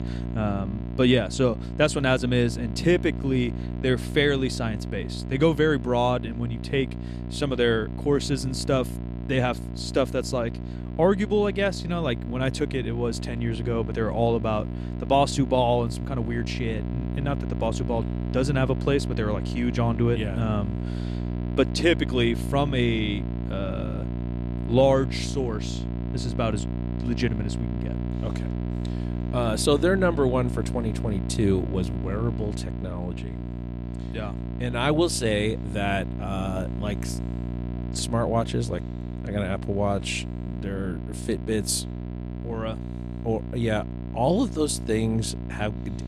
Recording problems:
electrical hum; noticeable; throughout; 60 Hz, 15 dB below the speech

